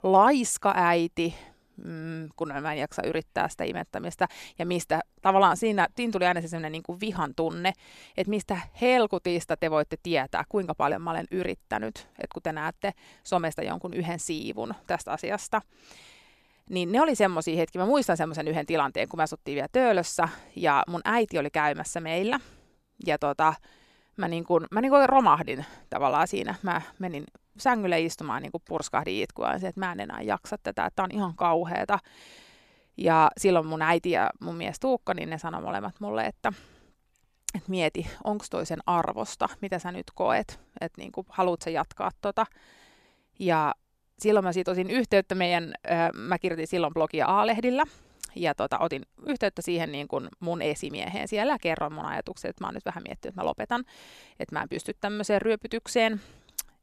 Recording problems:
none

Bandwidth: 14.5 kHz